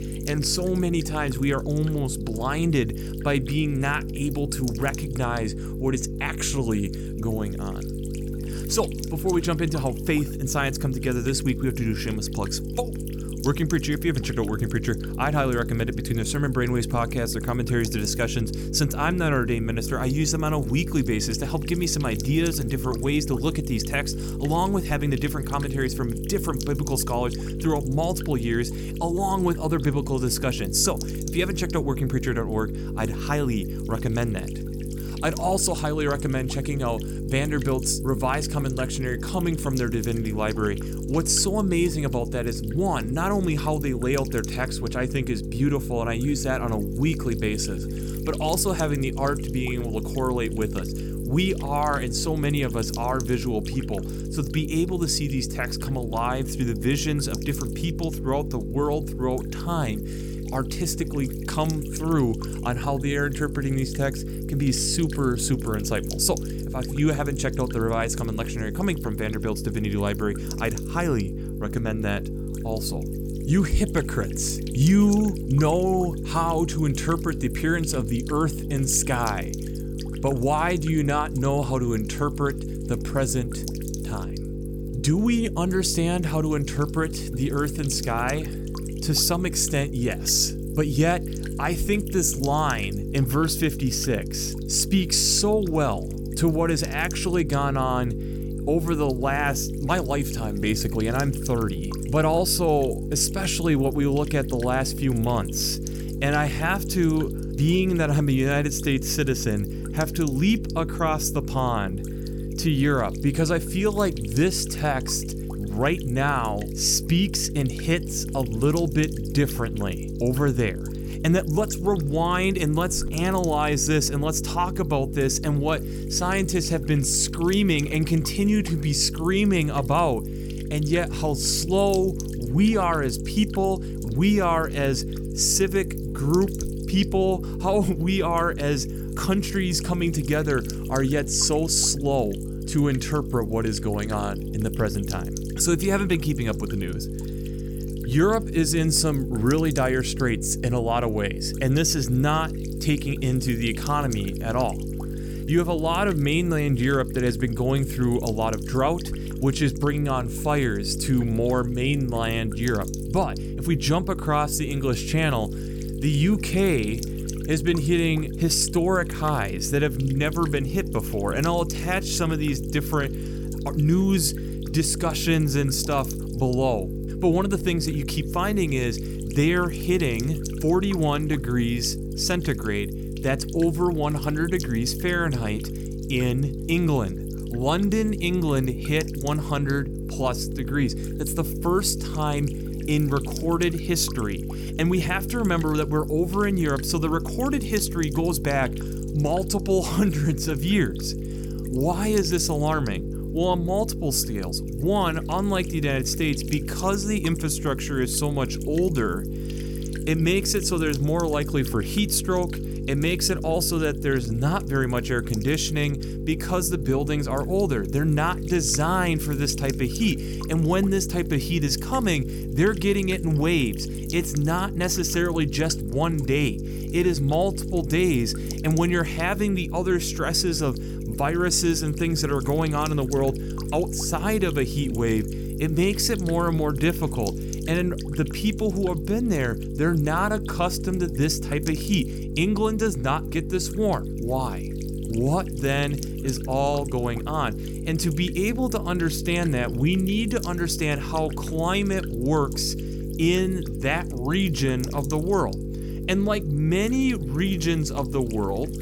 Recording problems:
electrical hum; noticeable; throughout; 50 Hz, 10 dB below the speech

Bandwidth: 17.5 kHz